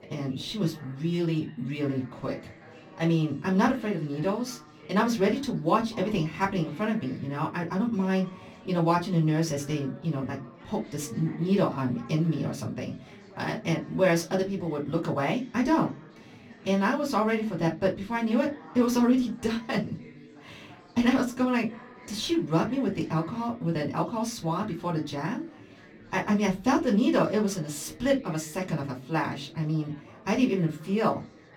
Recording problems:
off-mic speech; far
room echo; very slight; dies away in 0.2 s
chatter from many people; faint; throughout; 20 dB below the speech

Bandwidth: 18.5 kHz